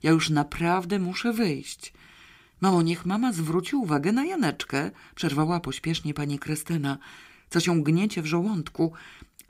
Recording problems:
none

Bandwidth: 15.5 kHz